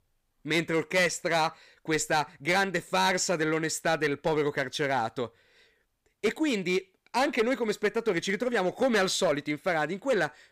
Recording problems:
distortion; slight; 5% of the sound clipped

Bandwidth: 15 kHz